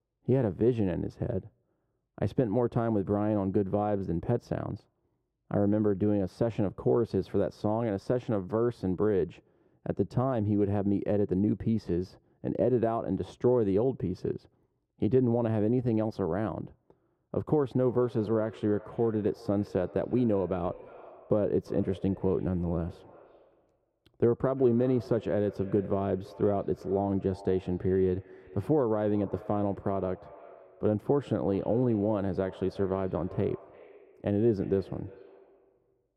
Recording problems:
muffled; very; fading above 1.5 kHz
echo of what is said; faint; from 18 s on; 340 ms later, 20 dB below the speech

